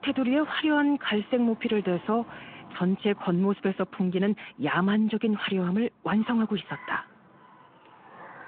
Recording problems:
phone-call audio
traffic noise; faint; throughout; 20 dB below the speech

